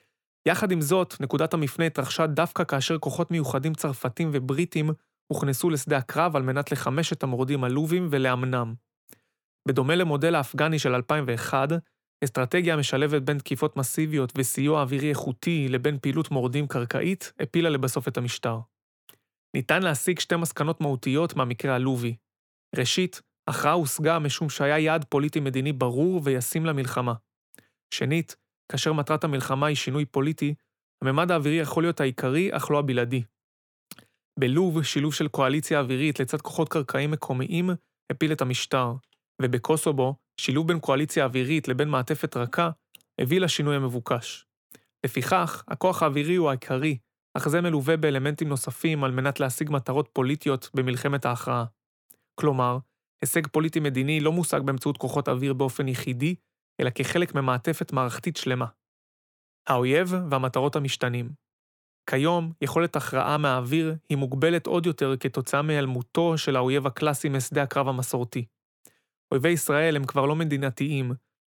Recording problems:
none

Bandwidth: 18.5 kHz